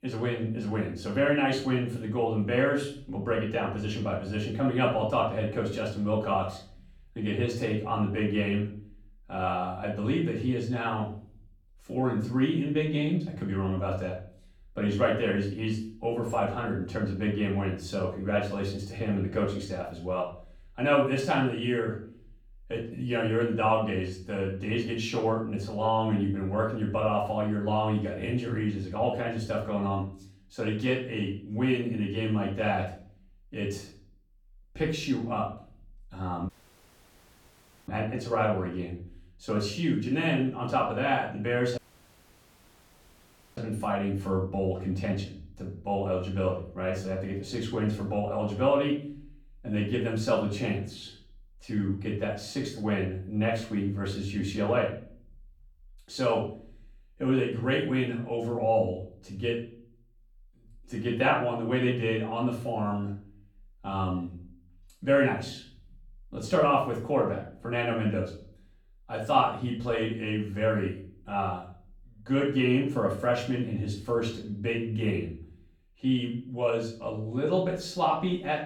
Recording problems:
off-mic speech; far
room echo; slight; dies away in 0.5 s
audio cutting out; at 36 s for 1.5 s and at 42 s for 2 s

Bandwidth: 18.5 kHz